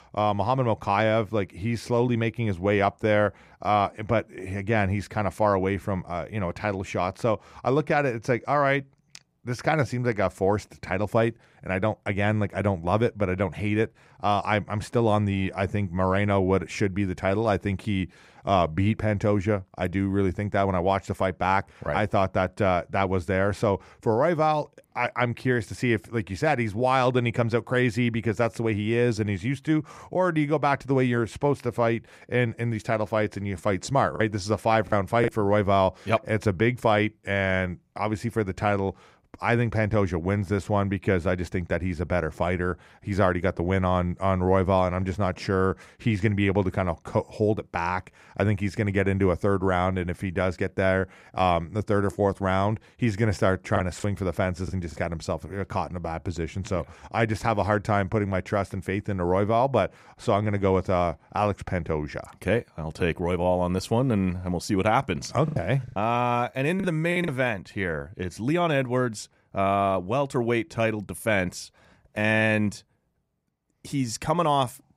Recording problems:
choppy; very; from 34 to 35 s, at 54 s and from 1:05 to 1:07; 8% of the speech affected

